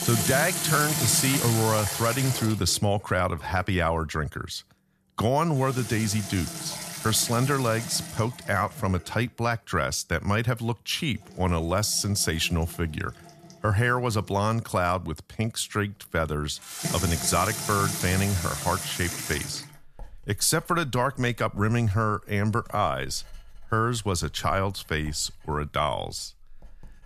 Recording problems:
household noises; loud; throughout; 3 dB below the speech

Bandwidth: 14 kHz